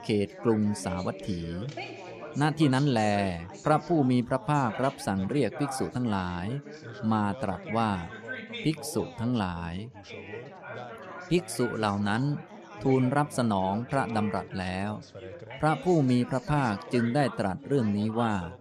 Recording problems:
background chatter; noticeable; throughout; 4 voices, 15 dB below the speech

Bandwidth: 13.5 kHz